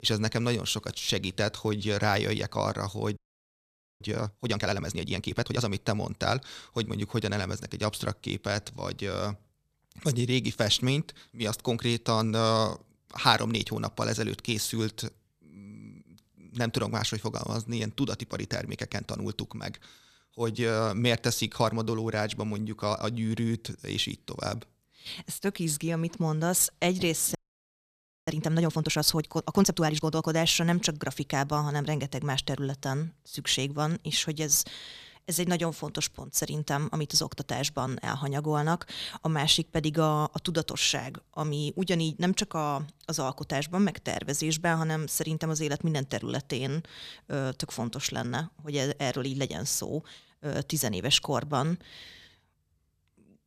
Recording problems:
audio freezing; at 3 s for 1 s and at 27 s for 1 s

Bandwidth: 14.5 kHz